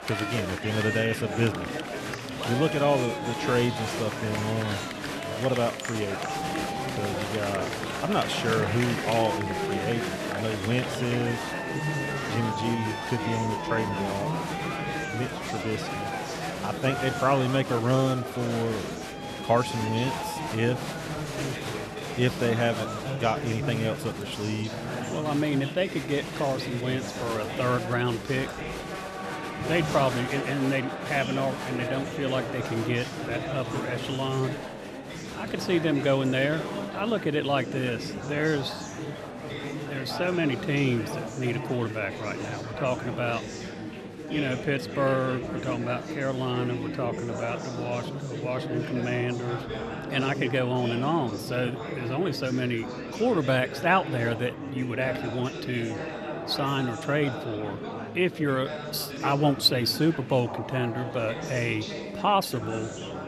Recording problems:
murmuring crowd; loud; throughout; 5 dB below the speech

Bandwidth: 13.5 kHz